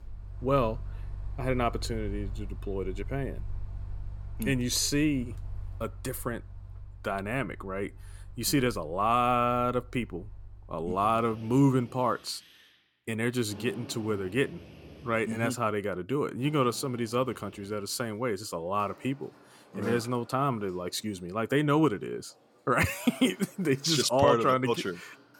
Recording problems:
machinery noise; noticeable; throughout; 15 dB below the speech

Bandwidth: 17.5 kHz